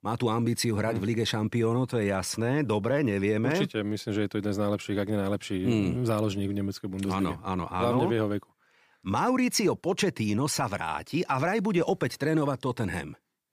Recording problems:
none

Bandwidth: 15 kHz